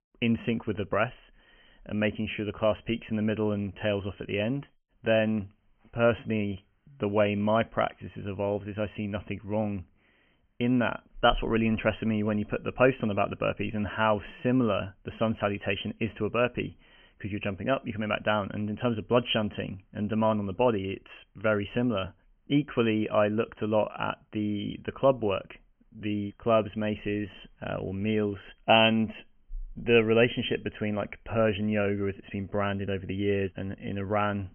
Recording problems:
high frequencies cut off; severe; nothing above 3 kHz

